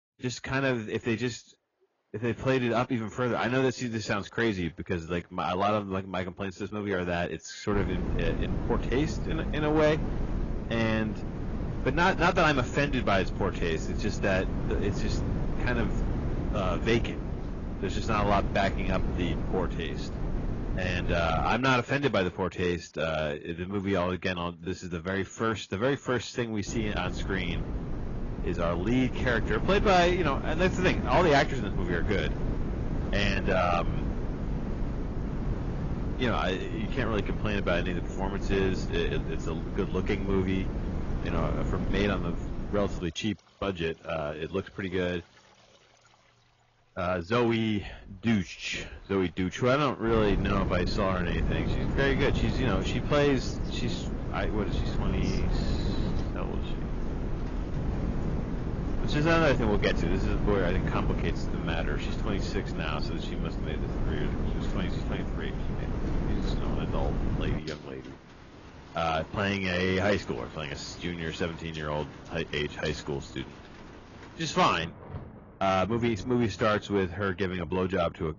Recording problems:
garbled, watery; badly
high frequencies cut off; noticeable; nothing above 7 kHz
distortion; slight; 10 dB below the speech
rain or running water; noticeable; throughout; 20 dB below the speech
wind noise on the microphone; occasional gusts; from 7.5 to 22 s, from 27 to 43 s and from 50 s to 1:08; 10 dB below the speech

